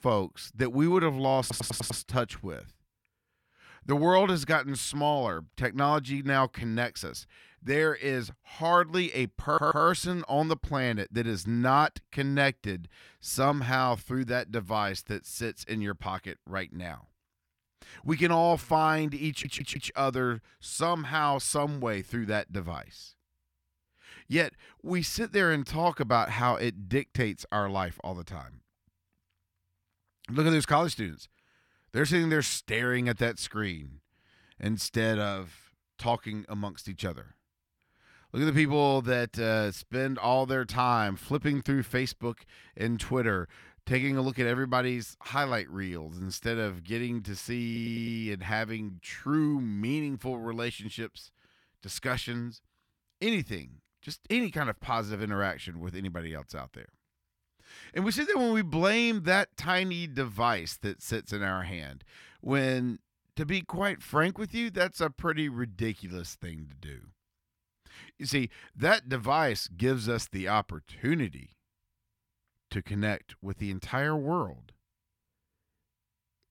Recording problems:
audio stuttering; 4 times, first at 1.5 s

